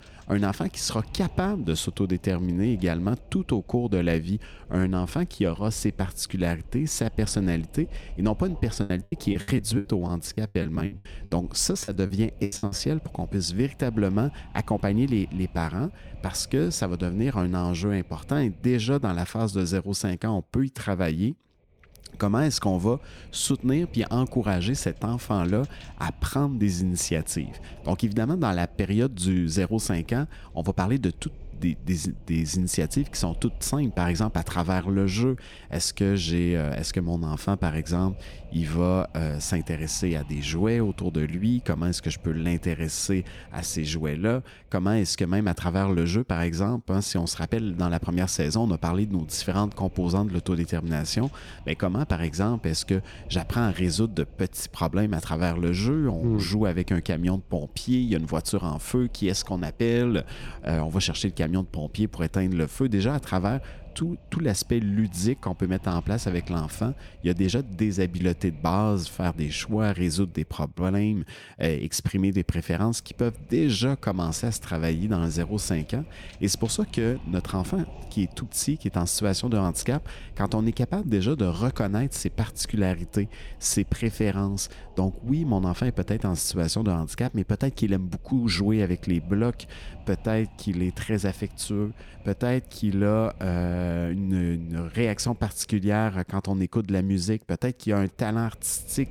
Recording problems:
wind noise on the microphone; occasional gusts; 25 dB below the speech
choppy; very; from 8.5 to 13 s; 22% of the speech affected

